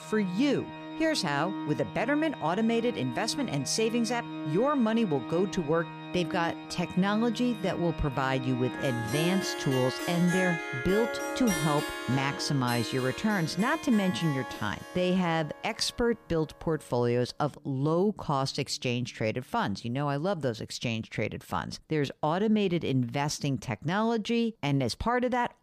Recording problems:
background music; loud; until 20 s; 8 dB below the speech

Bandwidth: 15 kHz